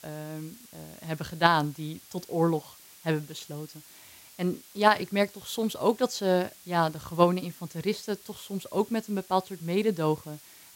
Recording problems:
hiss; faint; throughout; 20 dB below the speech

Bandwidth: 16 kHz